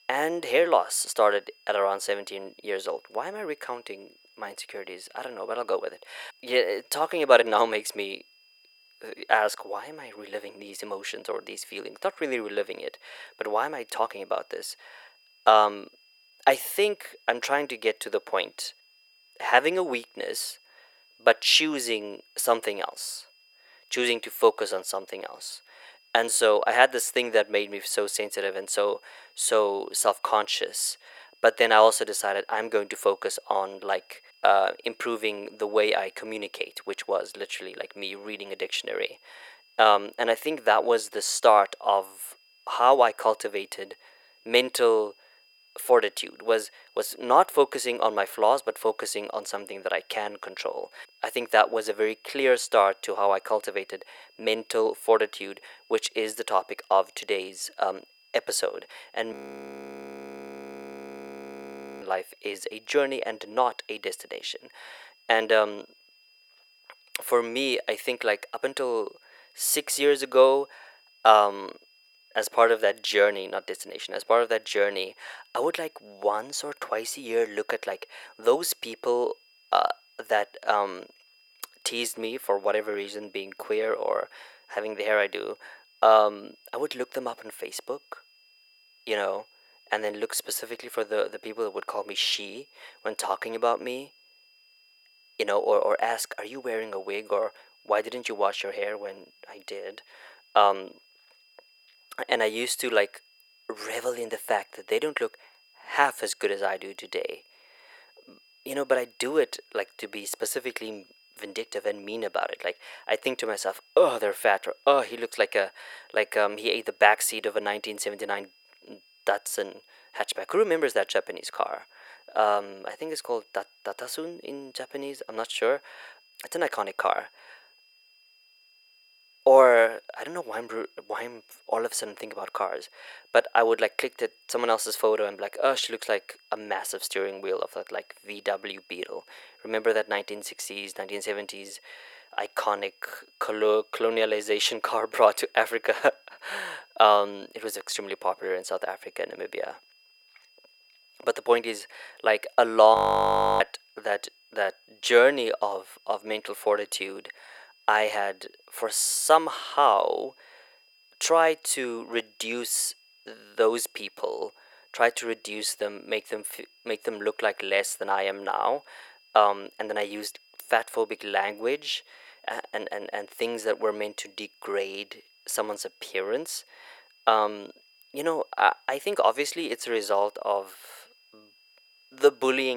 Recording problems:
thin; very; fading below 500 Hz
high-pitched whine; faint; throughout; 5 kHz, 30 dB below the speech
audio freezing; at 59 s for 2.5 s and at 2:33 for 0.5 s
abrupt cut into speech; at the end

